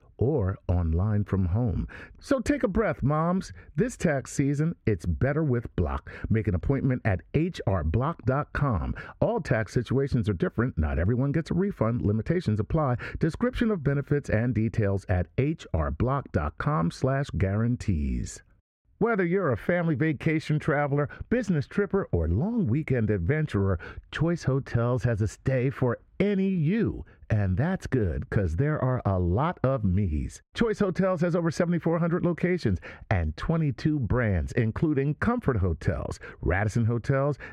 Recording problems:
muffled; slightly; fading above 3.5 kHz
squashed, flat; somewhat

